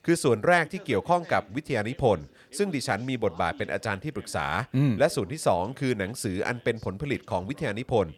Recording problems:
background chatter; faint; throughout; 2 voices, 25 dB below the speech

